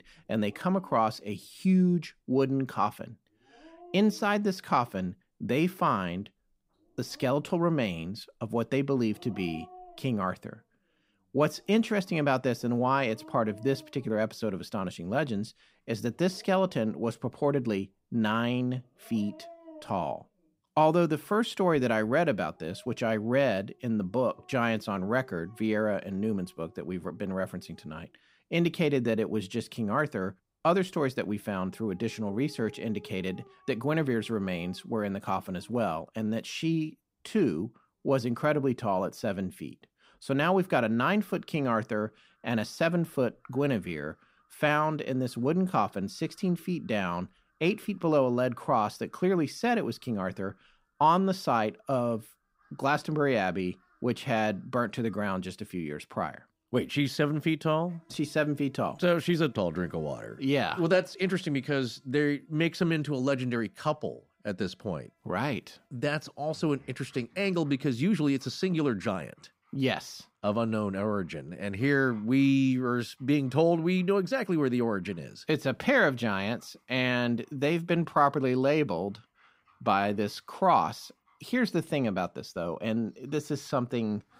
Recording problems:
animal sounds; faint; throughout; 30 dB below the speech

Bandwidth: 15.5 kHz